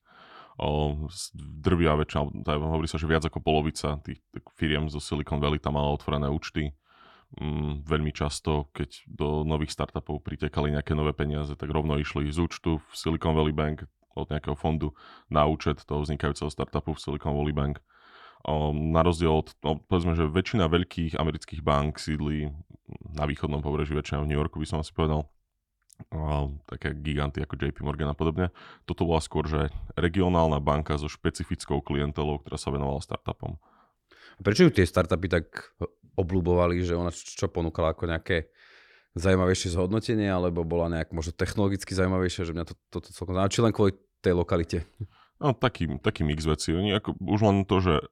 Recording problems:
none

